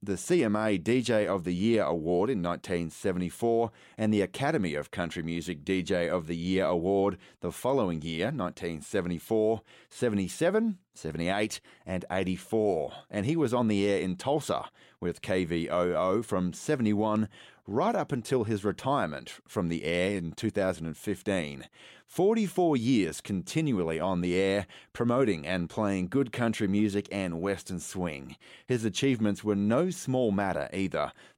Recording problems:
none

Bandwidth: 16 kHz